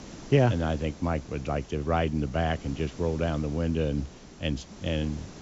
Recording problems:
high frequencies cut off; noticeable; nothing above 8 kHz
hiss; noticeable; throughout; 20 dB below the speech

